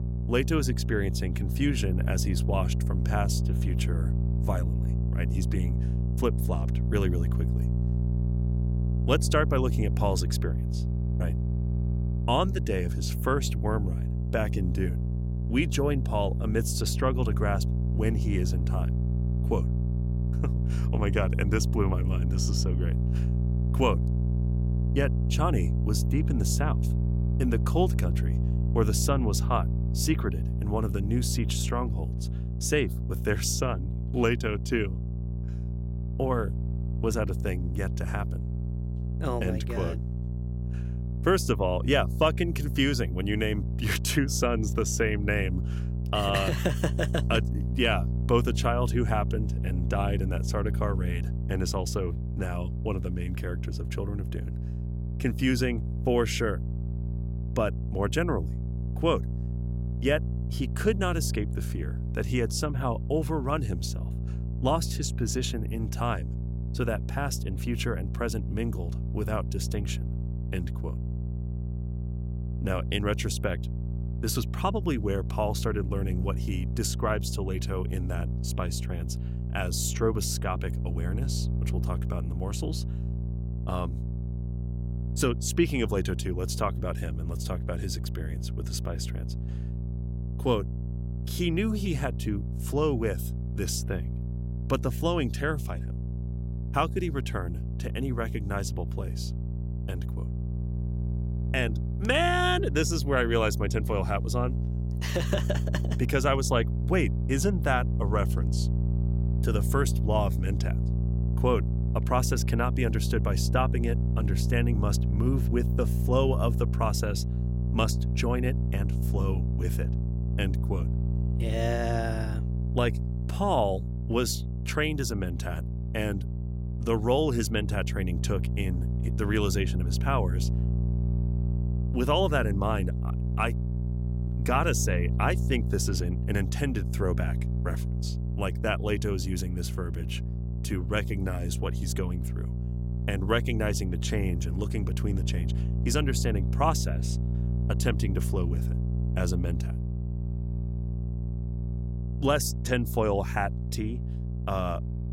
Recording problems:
electrical hum; noticeable; throughout; 60 Hz, 10 dB below the speech

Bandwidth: 16 kHz